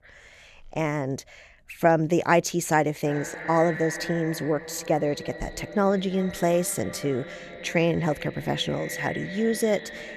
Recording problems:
echo of what is said; strong; from 3 s on; 330 ms later, 10 dB below the speech

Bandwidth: 13.5 kHz